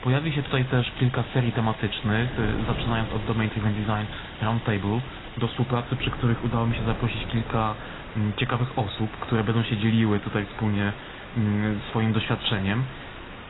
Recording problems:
garbled, watery; badly; nothing above 4 kHz
rain or running water; noticeable; throughout; 15 dB below the speech
wind noise on the microphone; occasional gusts; 15 dB below the speech

